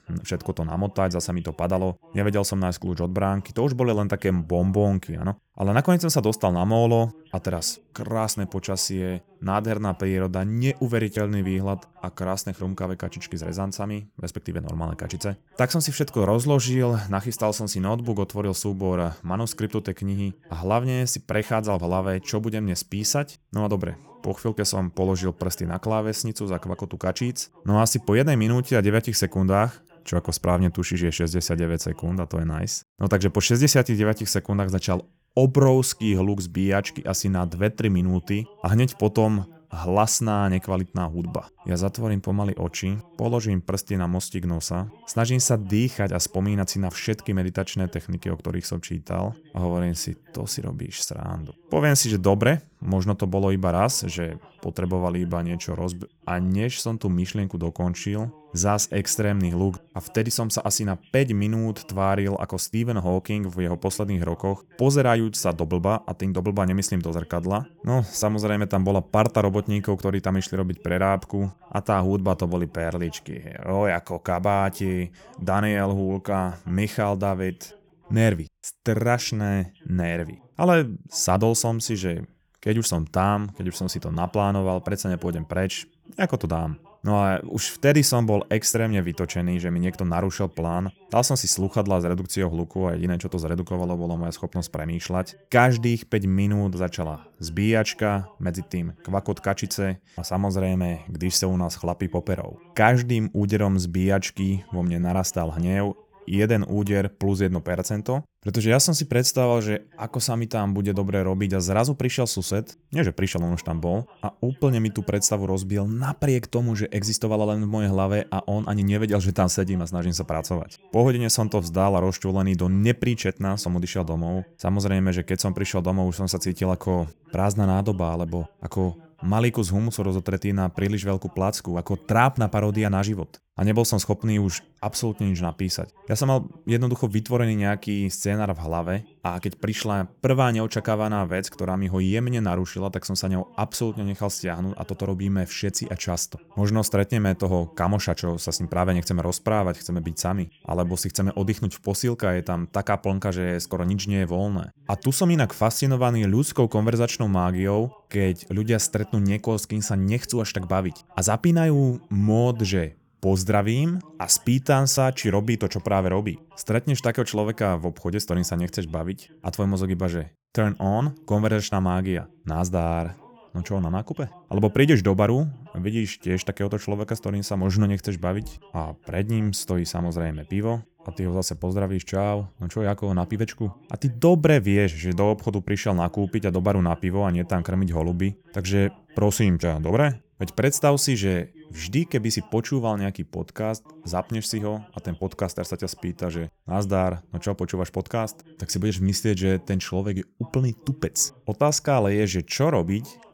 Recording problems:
voice in the background; faint; throughout; 30 dB below the speech

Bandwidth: 18.5 kHz